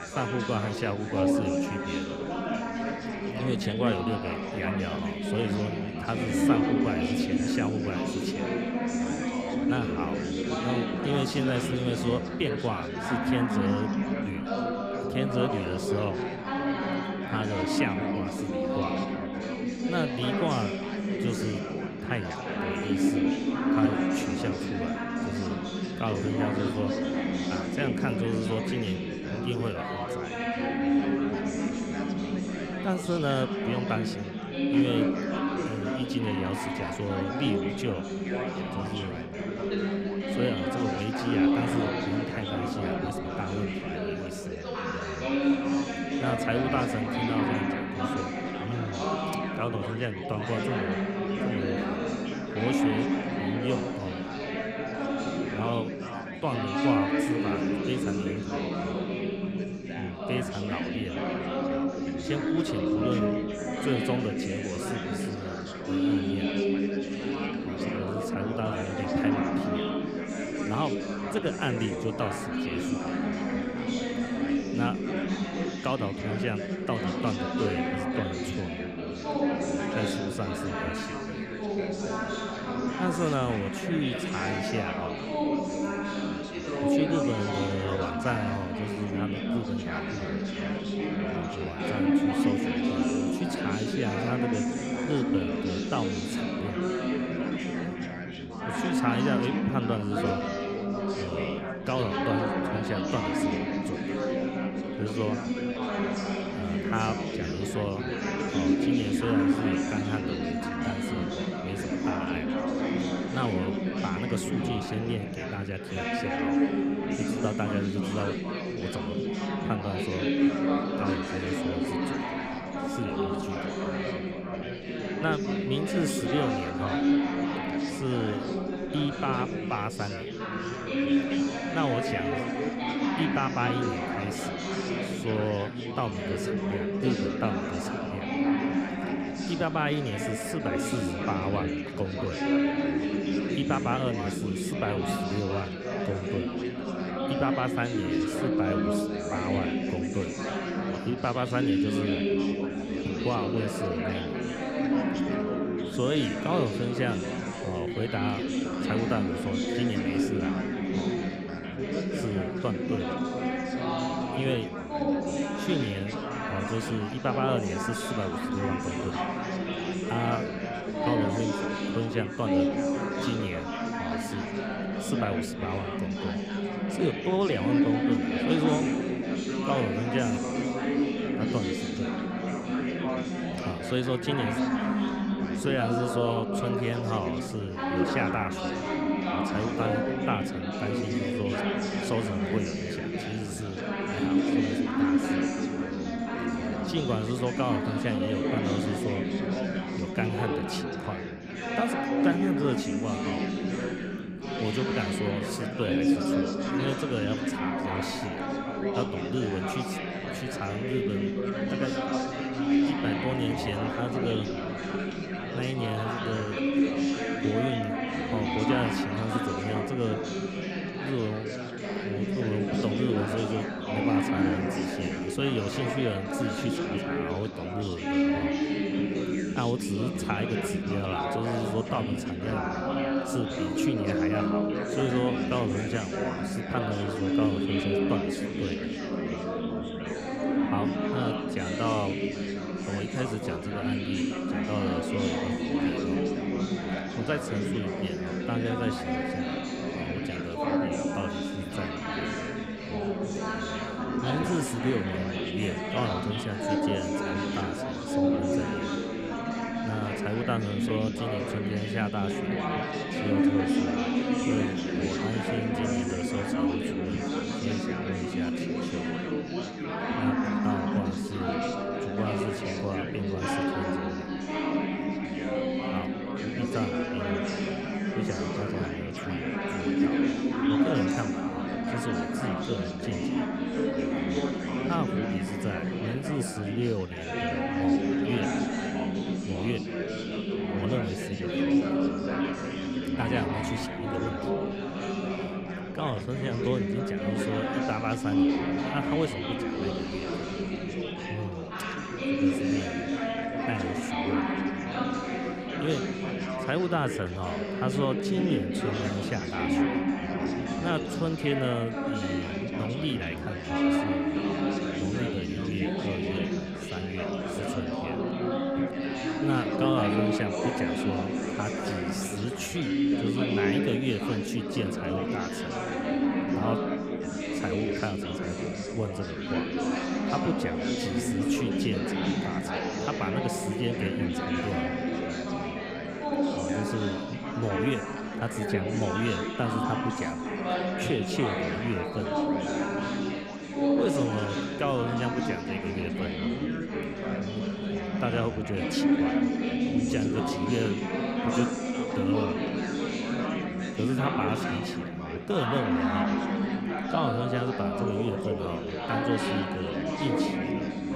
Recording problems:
chatter from many people; very loud; throughout; 4 dB above the speech

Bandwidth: 15.5 kHz